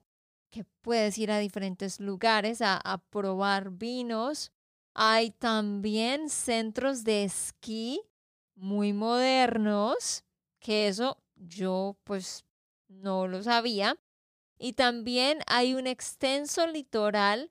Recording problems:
none

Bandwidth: 15 kHz